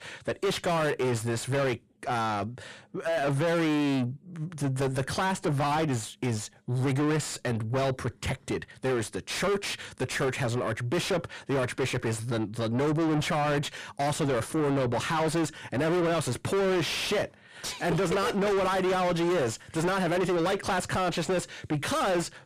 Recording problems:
distortion; heavy; 5 dB below the speech

